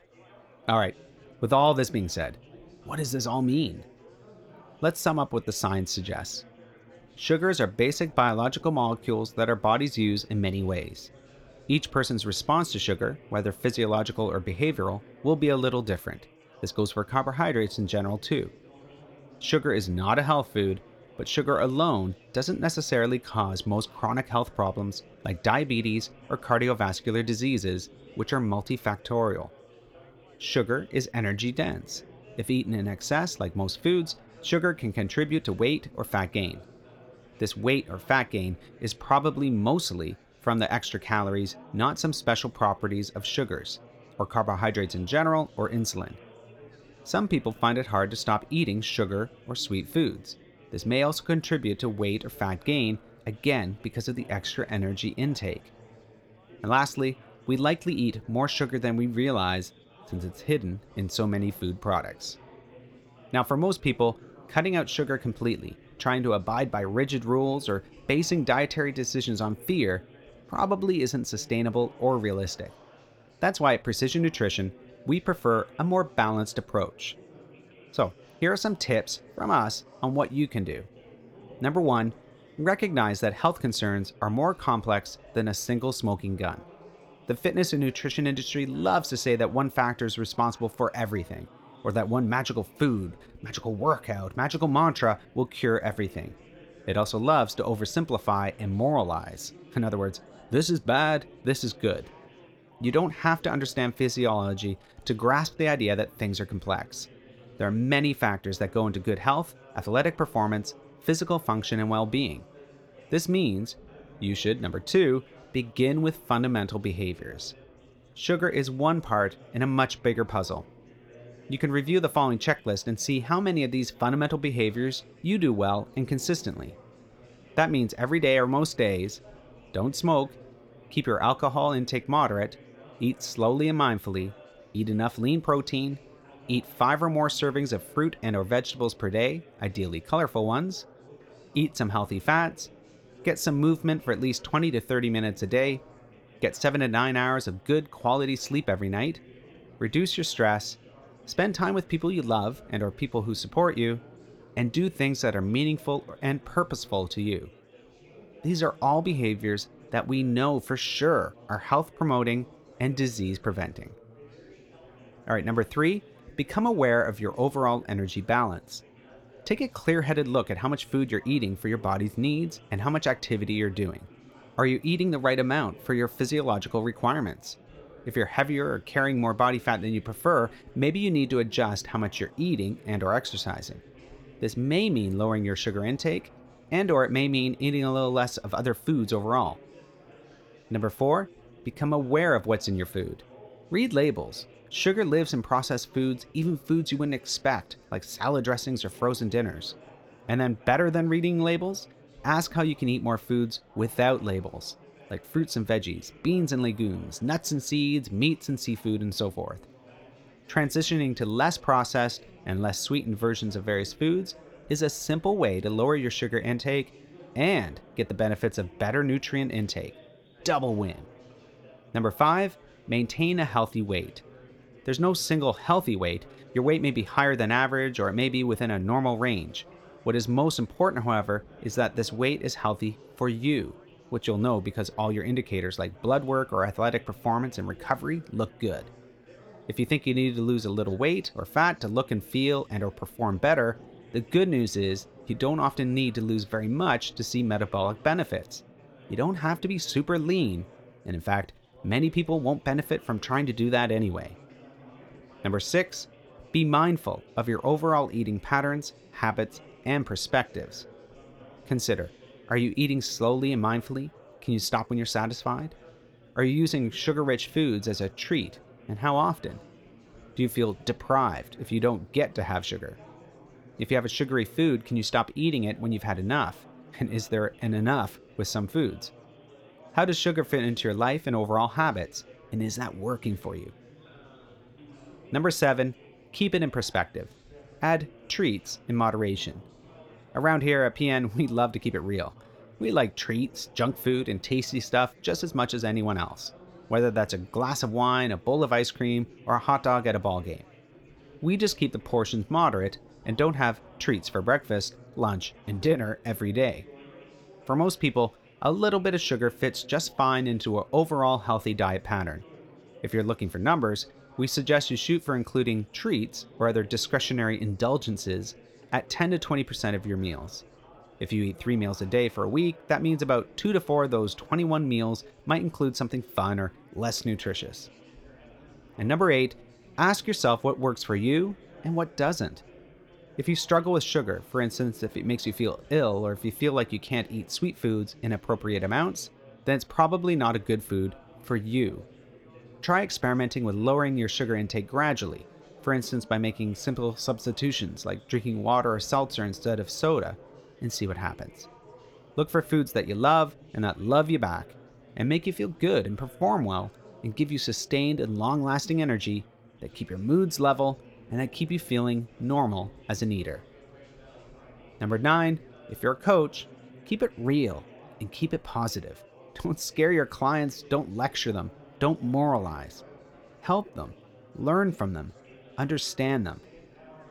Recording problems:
chatter from many people; faint; throughout; 25 dB below the speech

